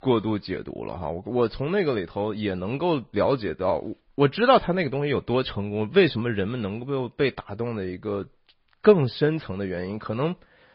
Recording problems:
high frequencies cut off; noticeable; nothing above 5 kHz
garbled, watery; slightly

